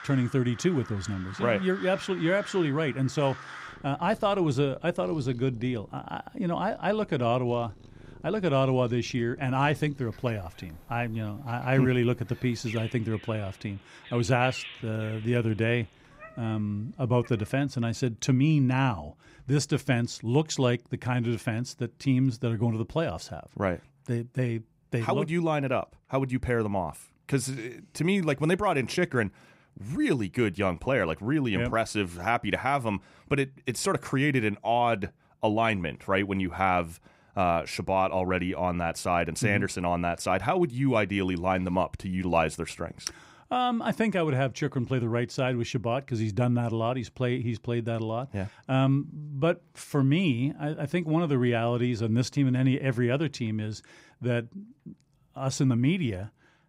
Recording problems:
animal sounds; noticeable; until 17 s; 20 dB below the speech

